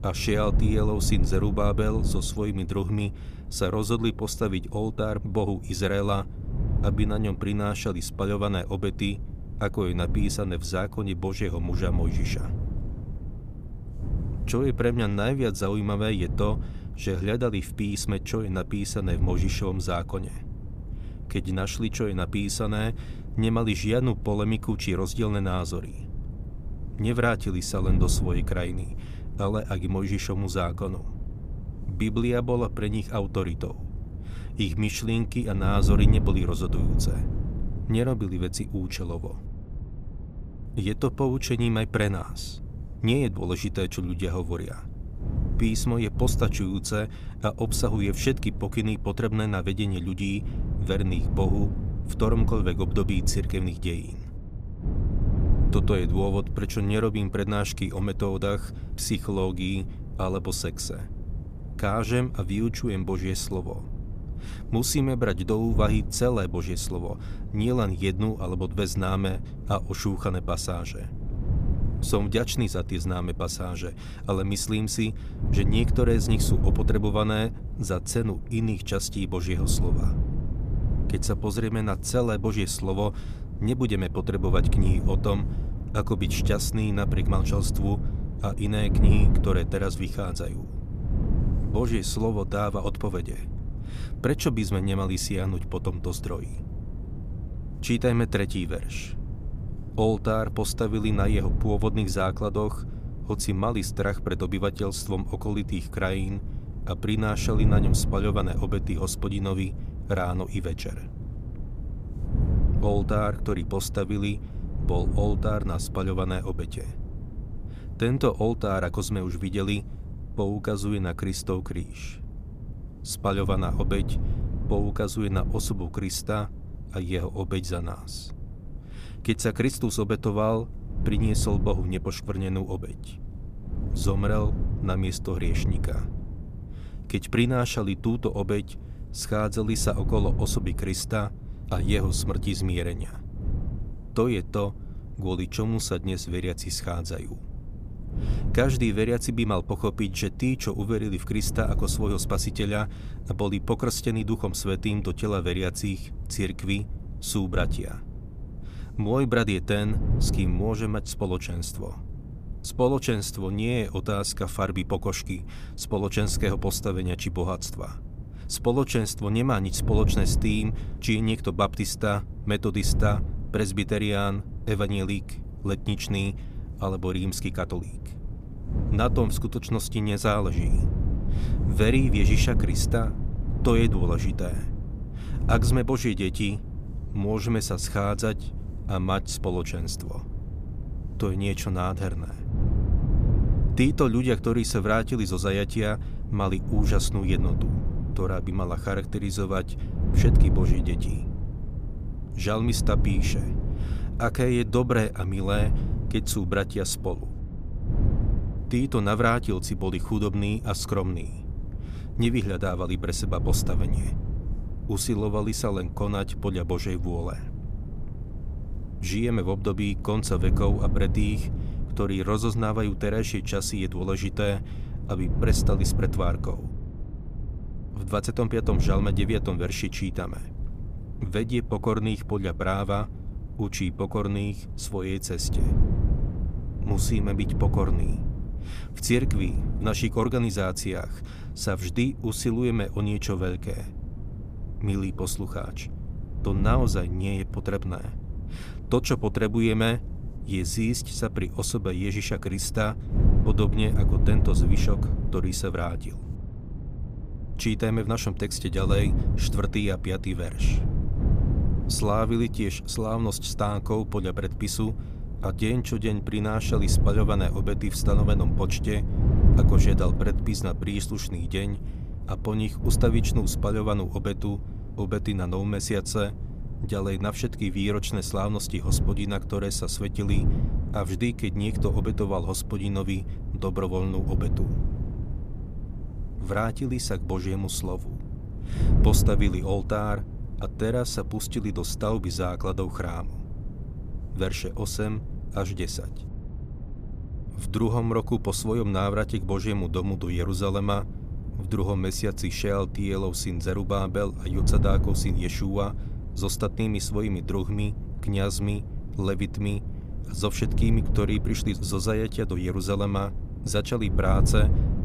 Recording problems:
wind noise on the microphone; occasional gusts; 15 dB below the speech

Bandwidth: 14.5 kHz